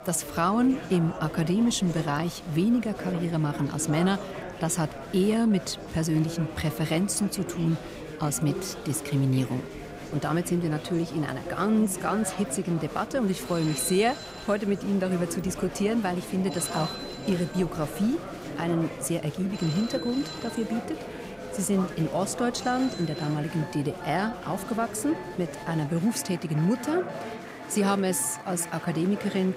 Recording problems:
chatter from many people; loud; throughout; 10 dB below the speech
alarms or sirens; noticeable; throughout; 15 dB below the speech

